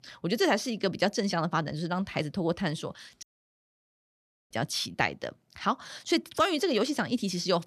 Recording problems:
audio cutting out; at 3 s for 1.5 s

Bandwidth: 14 kHz